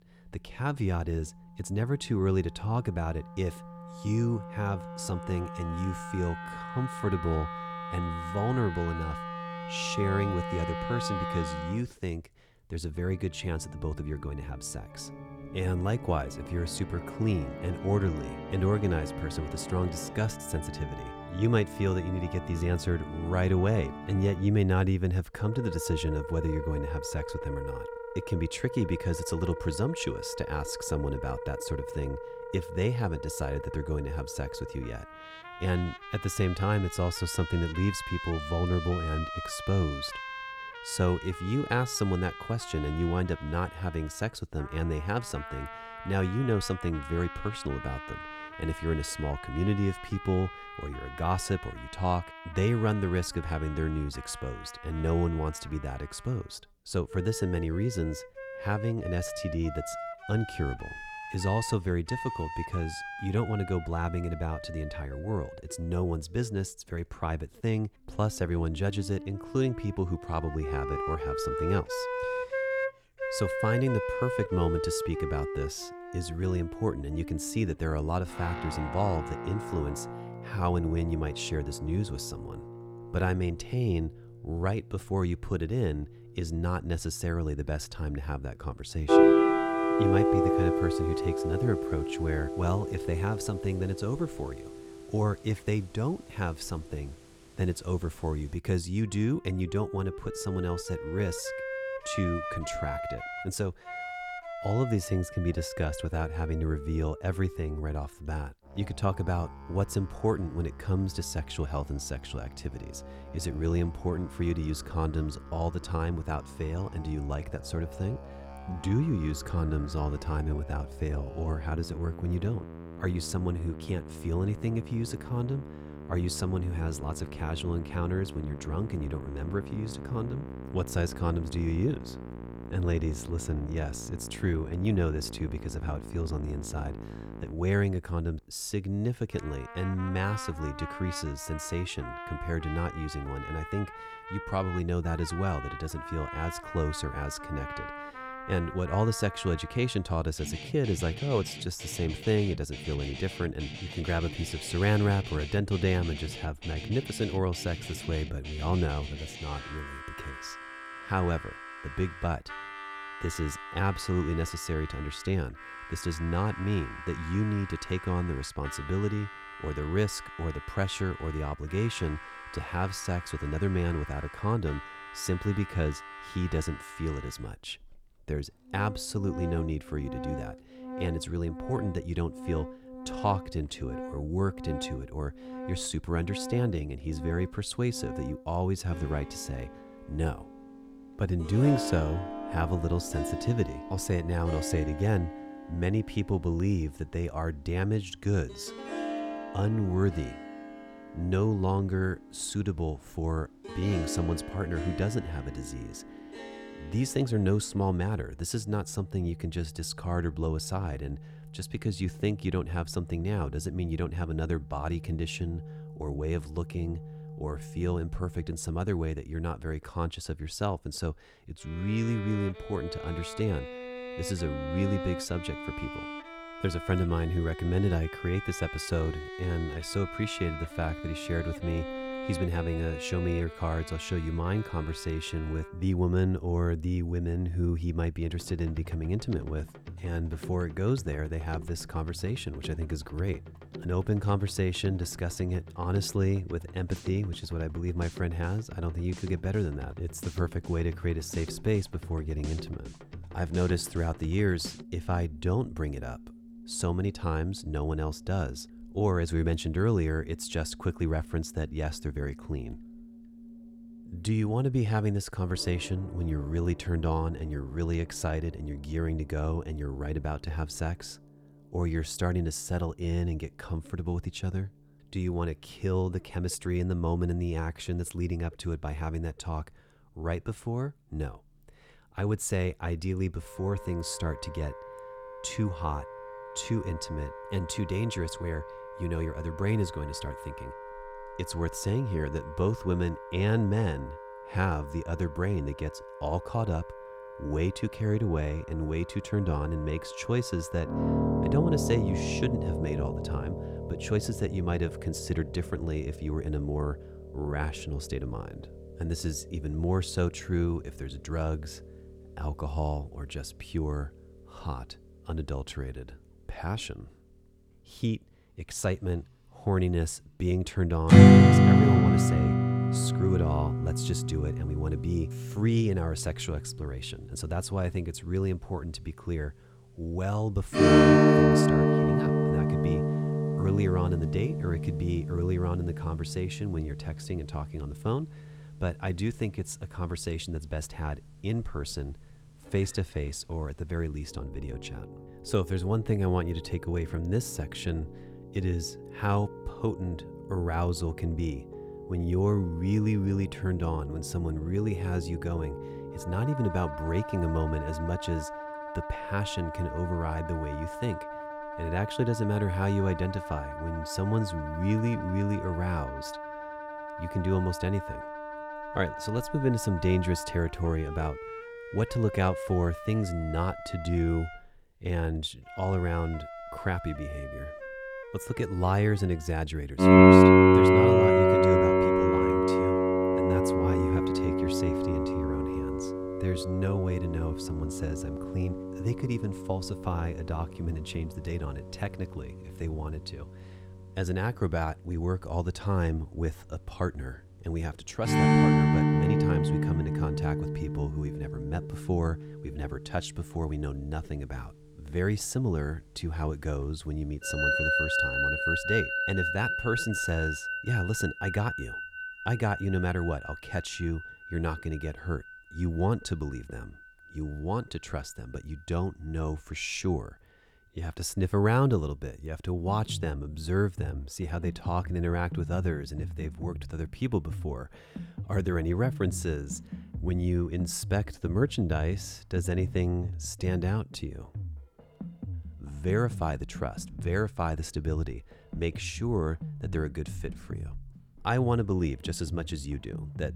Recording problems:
background music; loud; throughout; as loud as the speech

